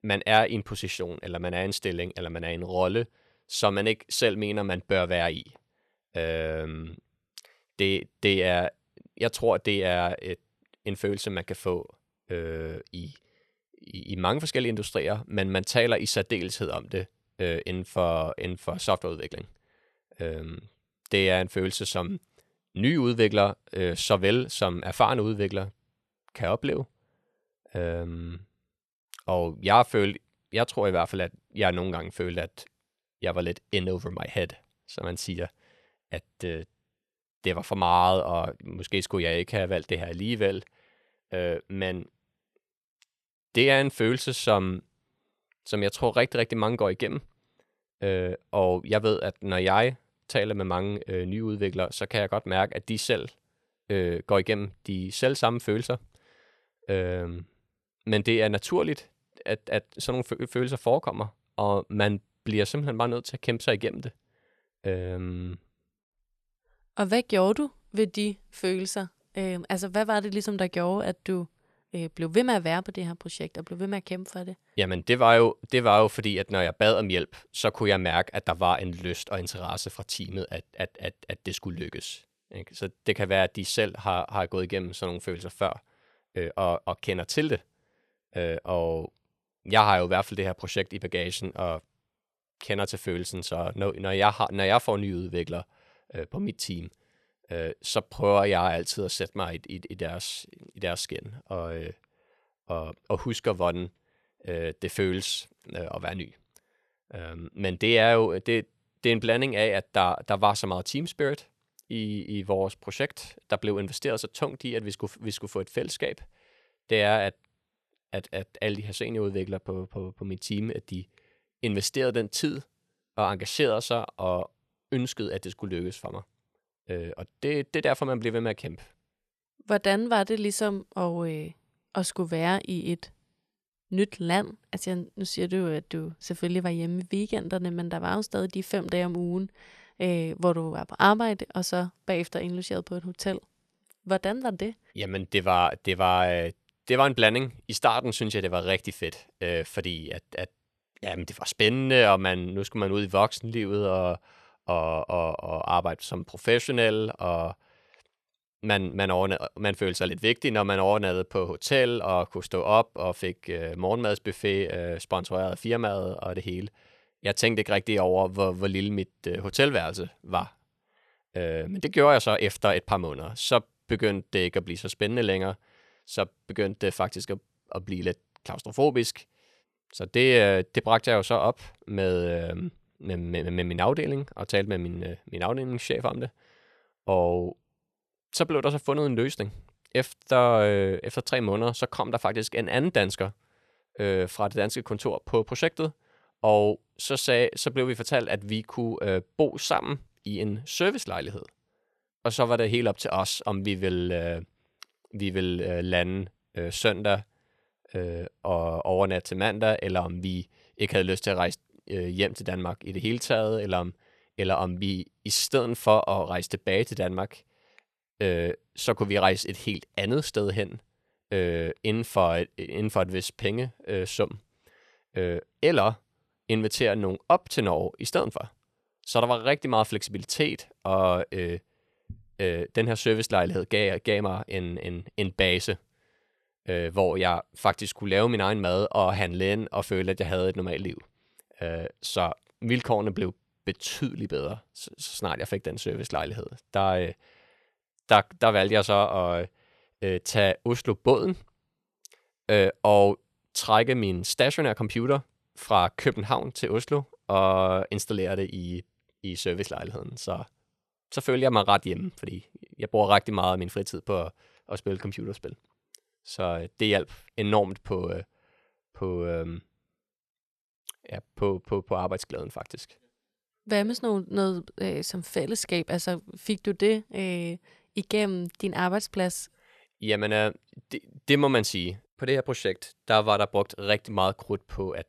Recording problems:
none

